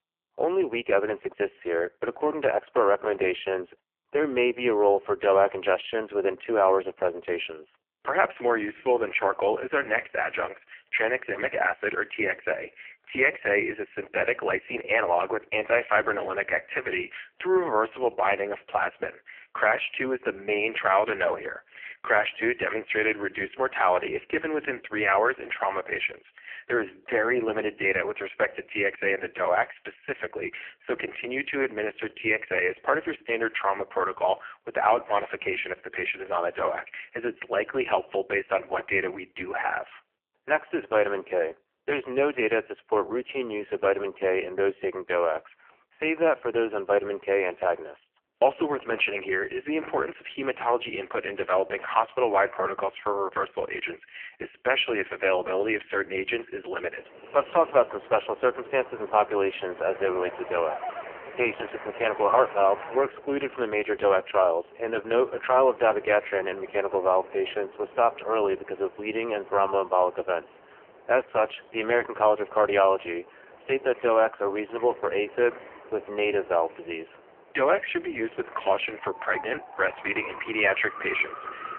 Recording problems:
phone-call audio; poor line; nothing above 3 kHz
wind in the background; noticeable; from 57 s on; 15 dB below the speech

